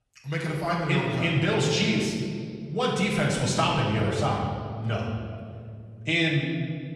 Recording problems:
off-mic speech; far
room echo; noticeable; dies away in 2 s

